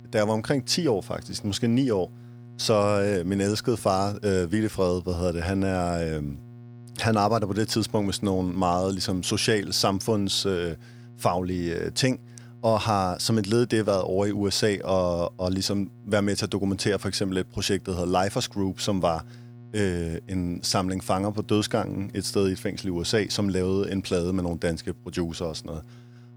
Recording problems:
electrical hum; faint; throughout; 60 Hz, 30 dB below the speech

